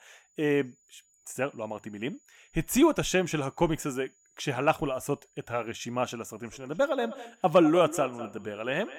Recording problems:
echo of what is said; strong; from 6.5 s on; 200 ms later, 10 dB below the speech
high-pitched whine; faint; throughout; 7 kHz, 35 dB below the speech

